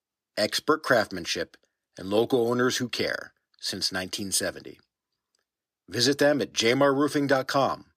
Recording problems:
thin; very slightly; fading below 500 Hz

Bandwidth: 14.5 kHz